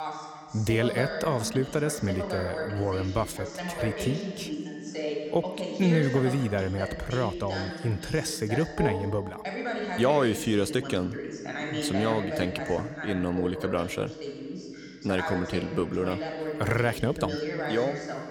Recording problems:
voice in the background; loud; throughout; 5 dB below the speech

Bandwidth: 18.5 kHz